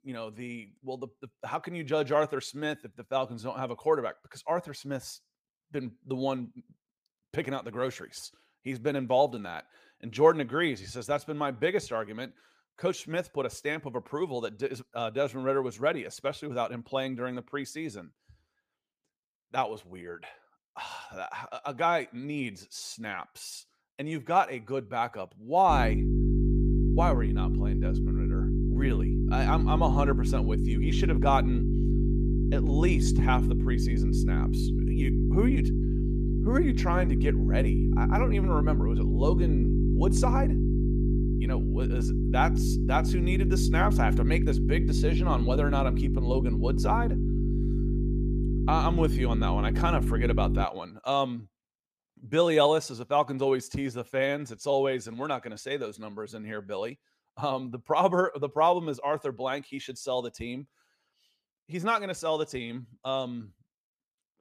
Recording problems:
electrical hum; loud; from 26 to 51 s; 50 Hz, 6 dB below the speech

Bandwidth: 15 kHz